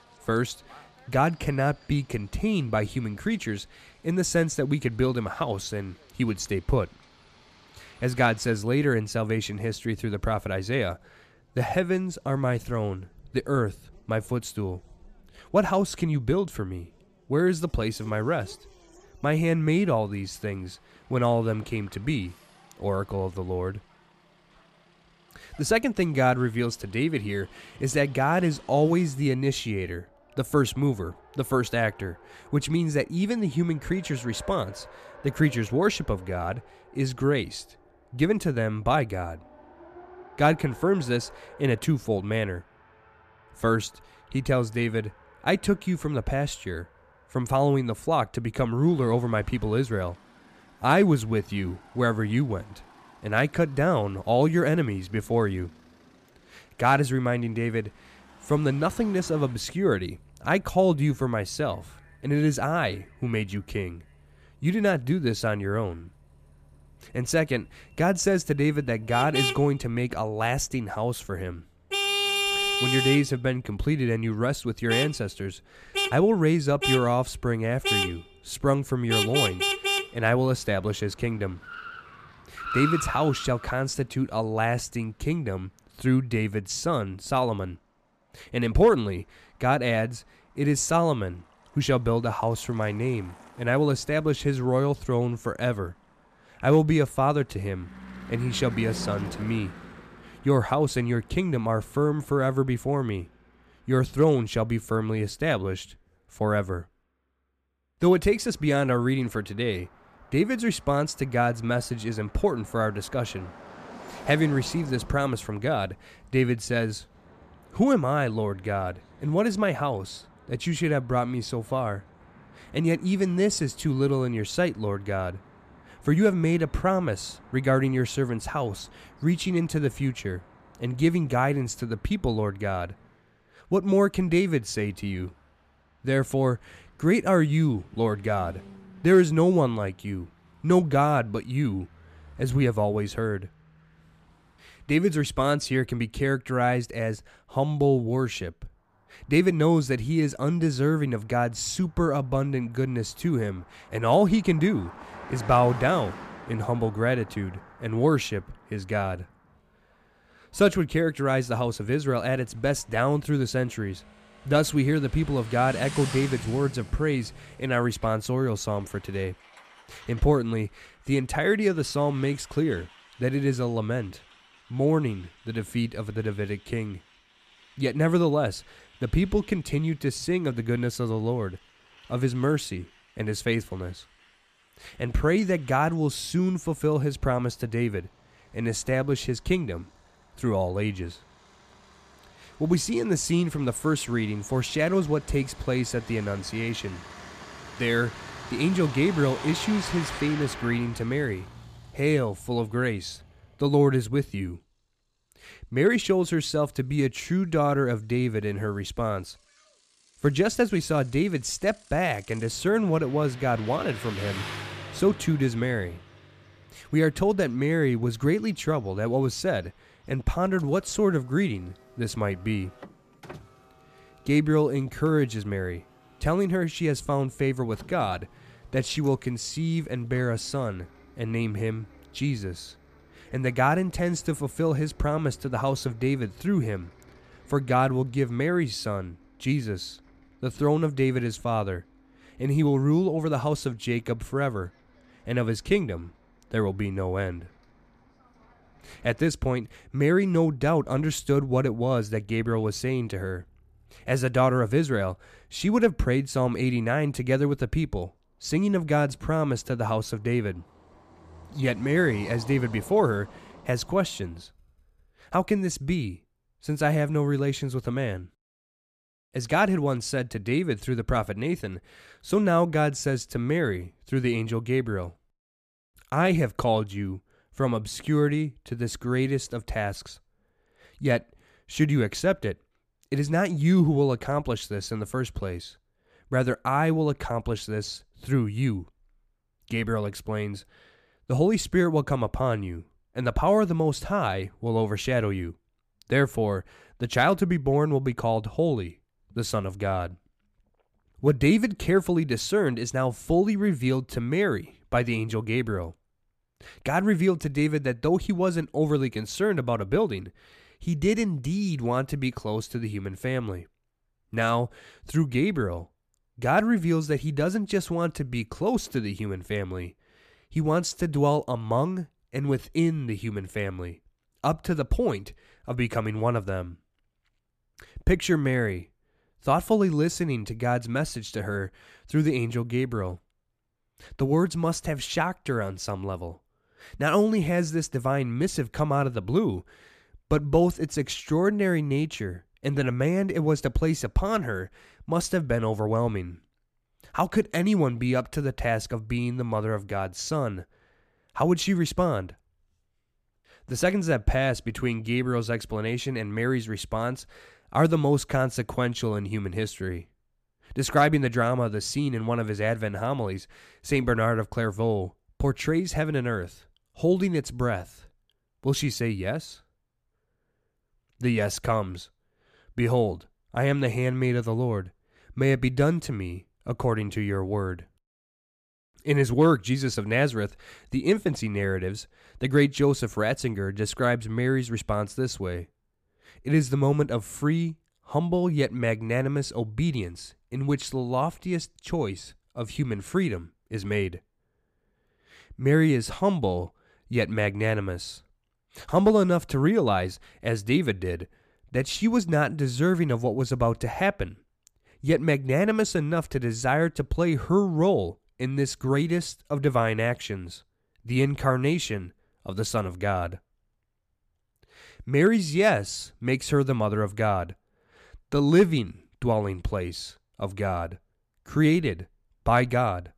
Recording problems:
traffic noise; loud; until 4:25; 9 dB below the speech

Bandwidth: 14.5 kHz